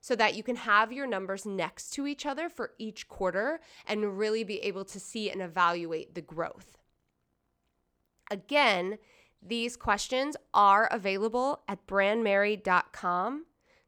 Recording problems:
none

